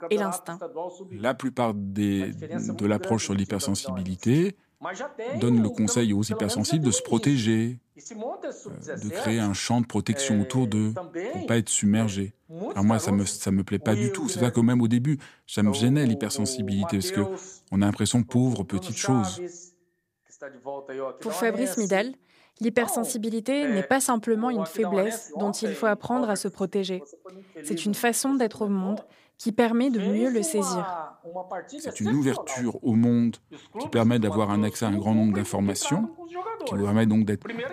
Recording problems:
voice in the background; noticeable; throughout; 10 dB below the speech

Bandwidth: 15 kHz